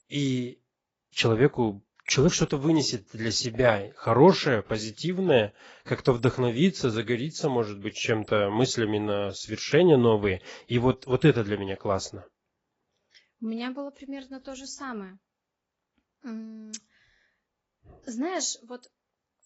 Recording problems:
garbled, watery; badly; nothing above 7.5 kHz
high-pitched whine; very faint; mostly in the pauses; 7.5 kHz, 50 dB below the speech

